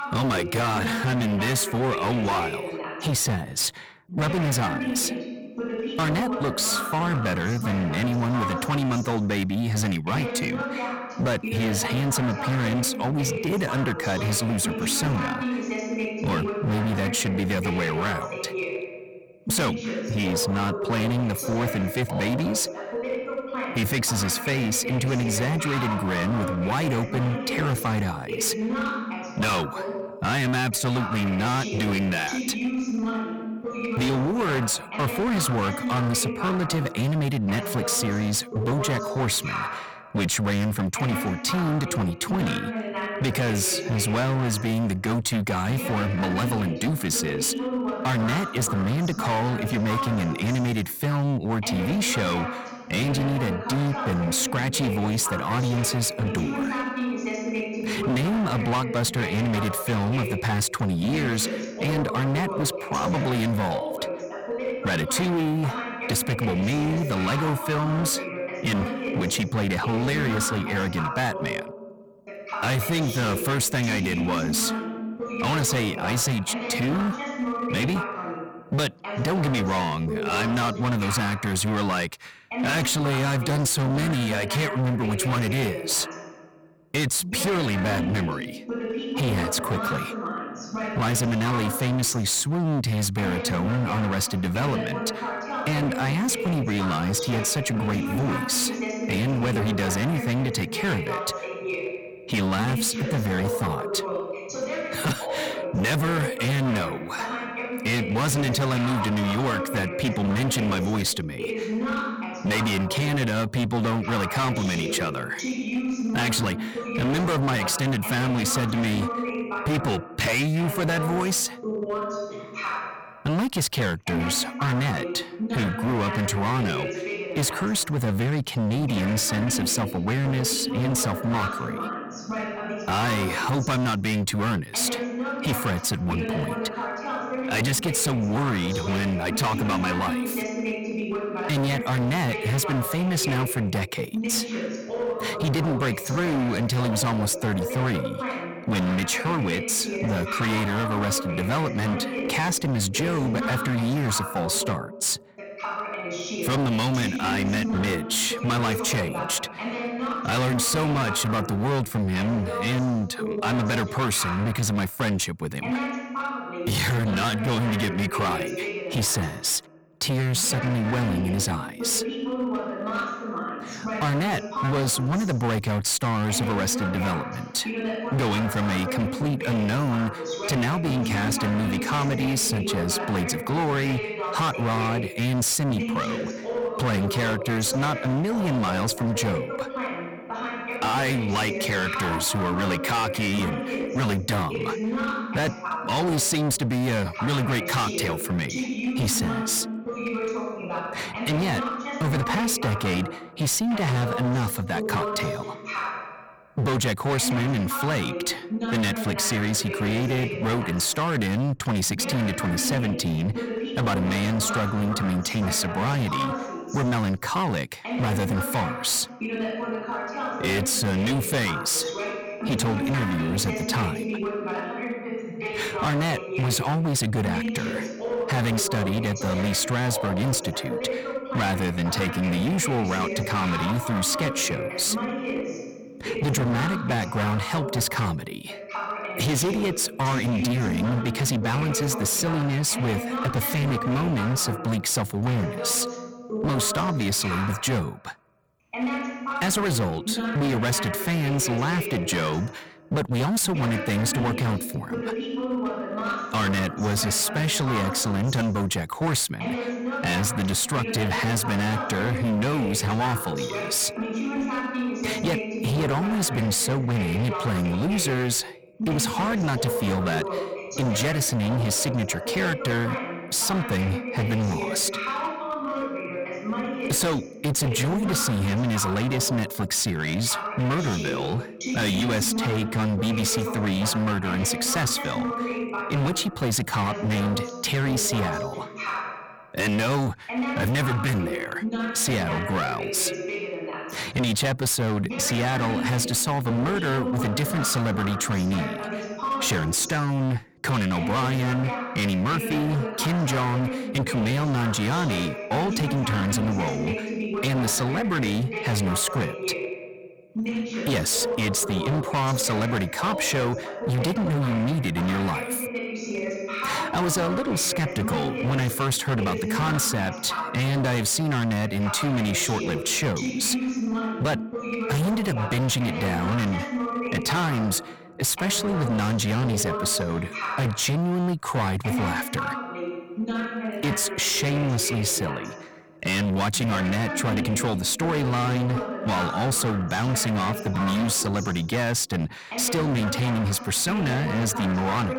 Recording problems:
distortion; heavy; 26% of the sound clipped
voice in the background; loud; throughout; 6 dB below the speech

